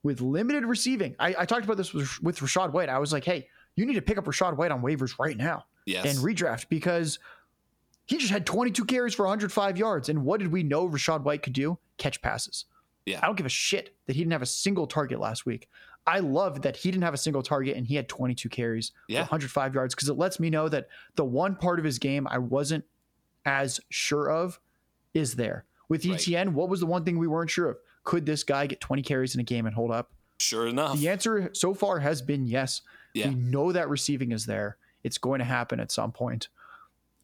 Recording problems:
squashed, flat; heavily

